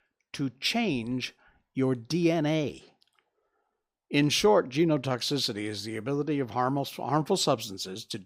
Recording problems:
none

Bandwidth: 15.5 kHz